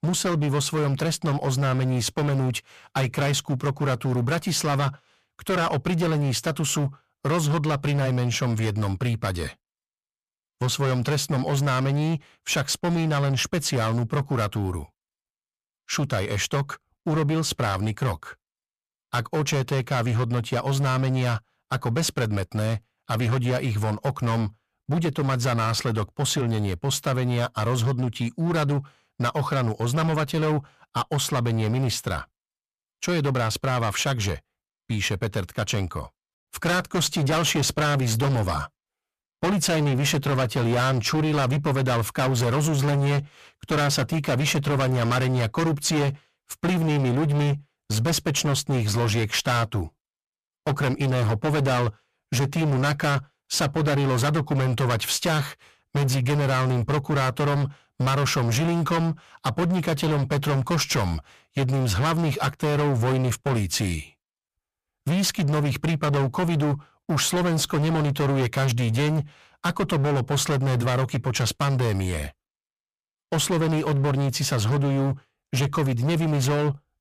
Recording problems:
distortion; heavy; 26% of the sound clipped

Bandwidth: 14.5 kHz